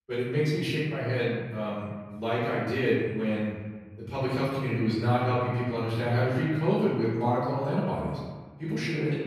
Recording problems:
room echo; strong; dies away in 1.3 s
off-mic speech; far

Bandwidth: 14.5 kHz